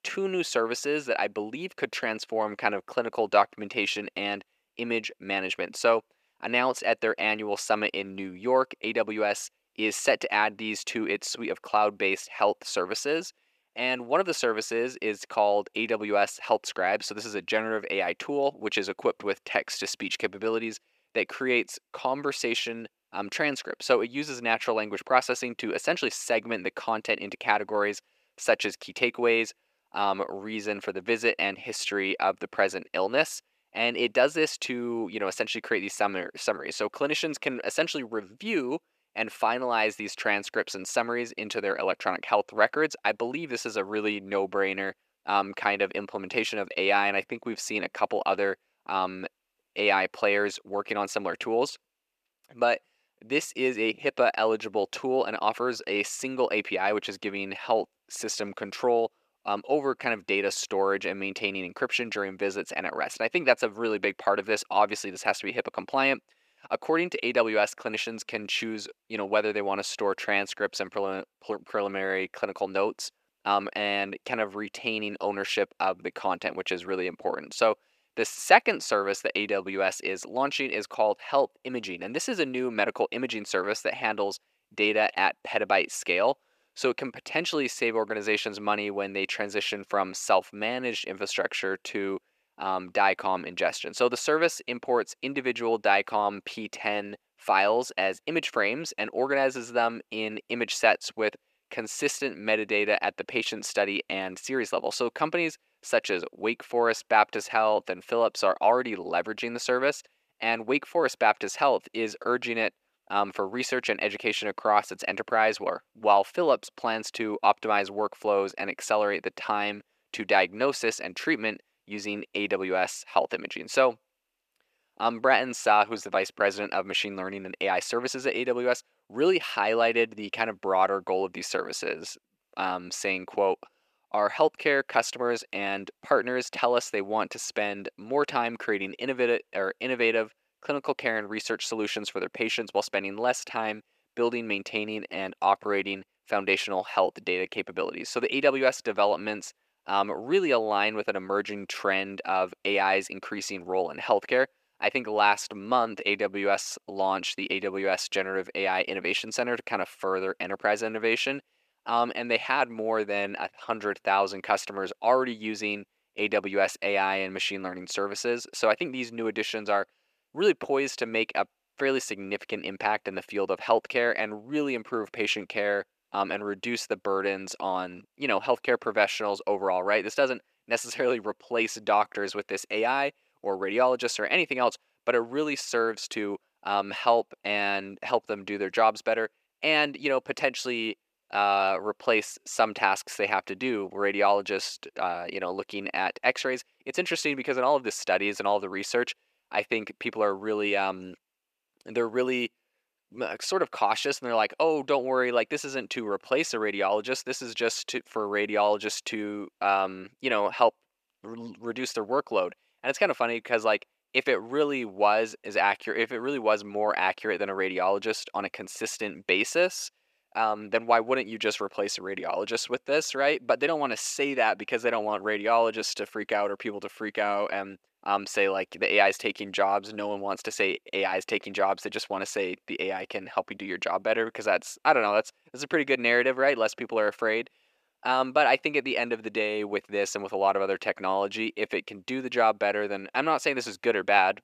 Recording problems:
thin; somewhat; fading below 500 Hz

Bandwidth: 14.5 kHz